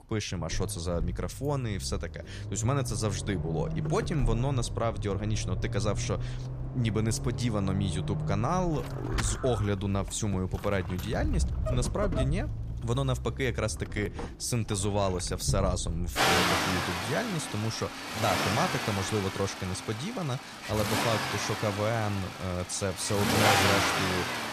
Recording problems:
traffic noise; loud; throughout; 1 dB below the speech

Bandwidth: 14.5 kHz